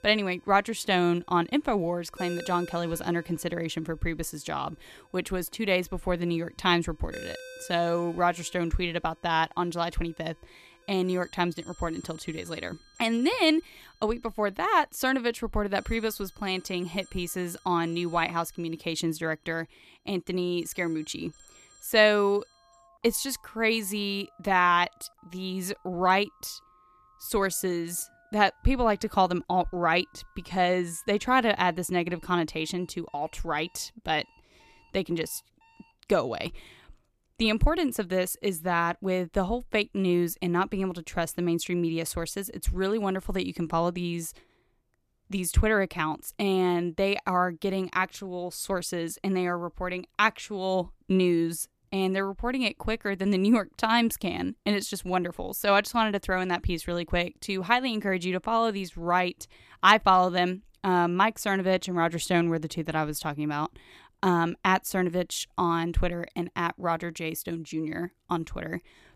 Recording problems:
alarms or sirens; faint; until 37 s; 25 dB below the speech

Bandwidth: 14.5 kHz